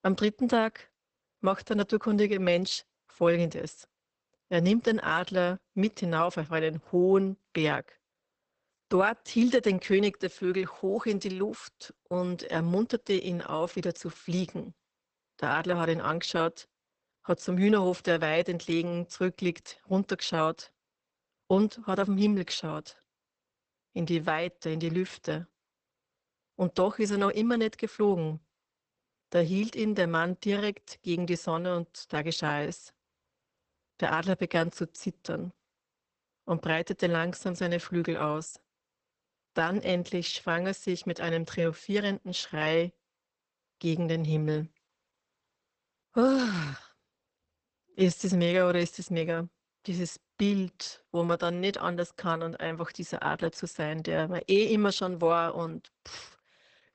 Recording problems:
garbled, watery; badly; nothing above 8 kHz

